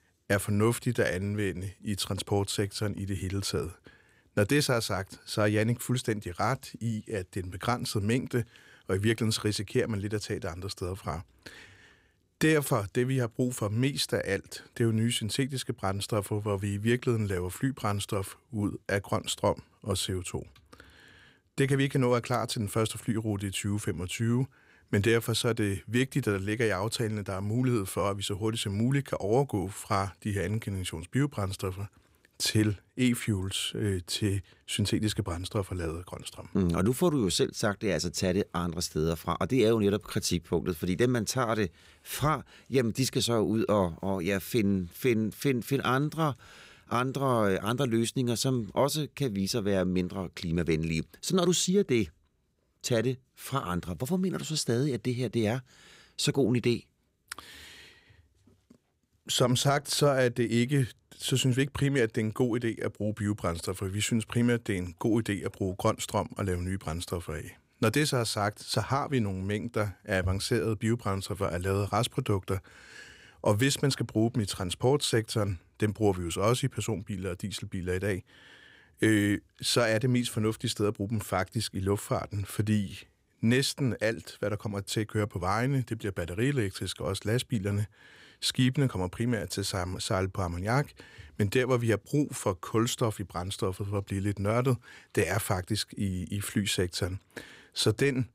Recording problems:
none

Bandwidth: 15.5 kHz